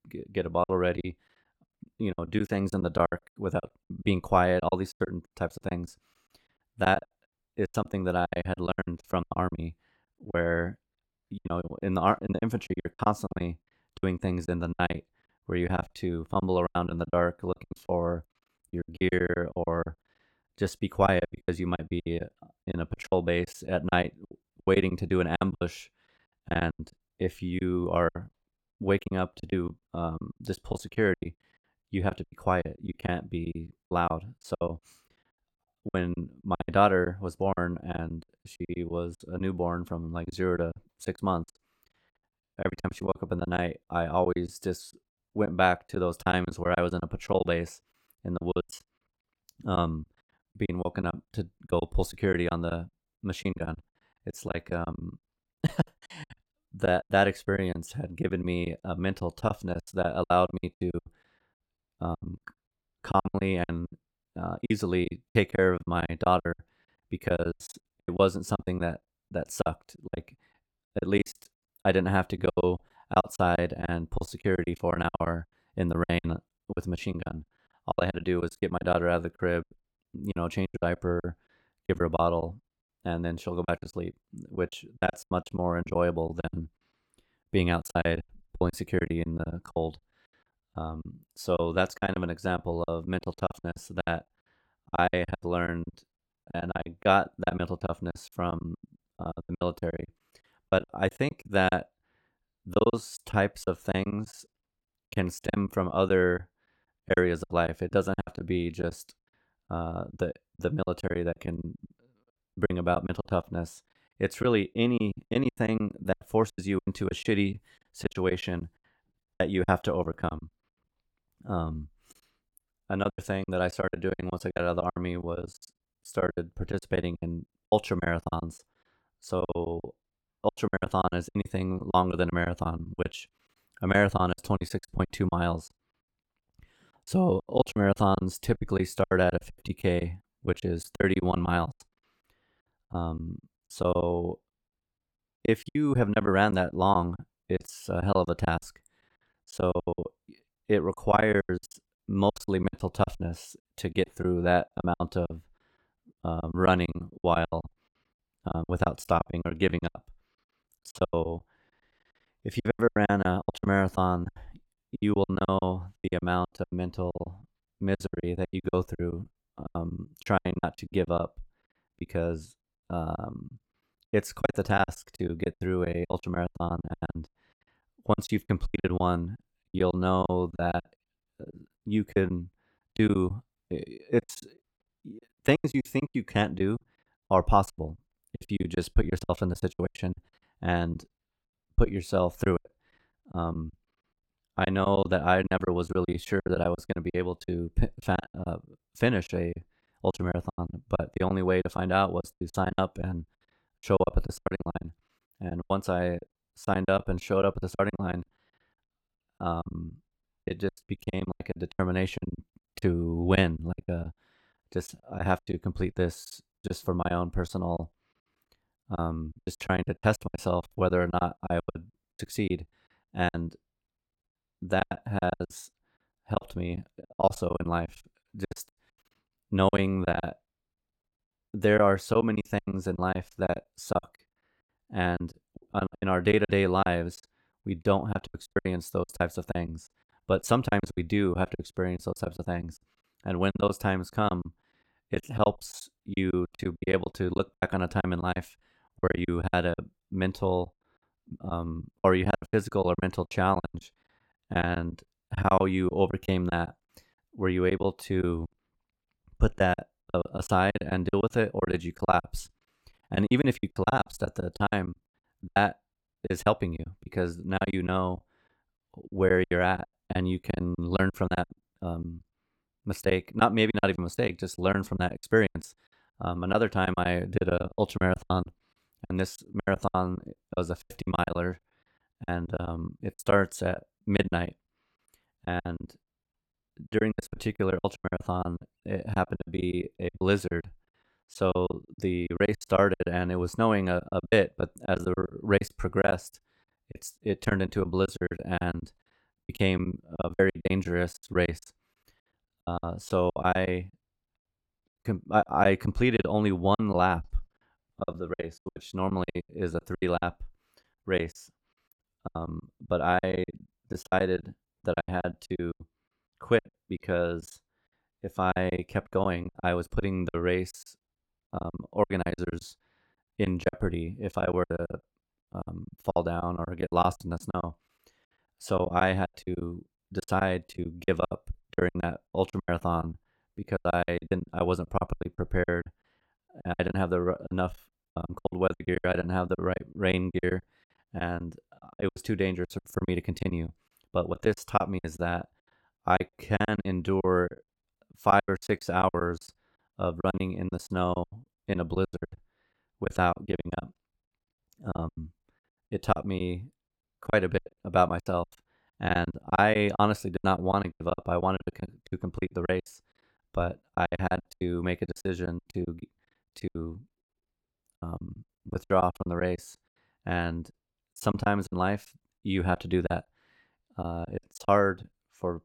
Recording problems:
choppy; very; 18% of the speech affected

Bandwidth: 17.5 kHz